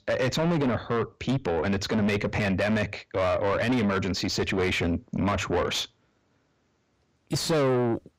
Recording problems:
distortion; heavy; 6 dB below the speech

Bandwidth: 15.5 kHz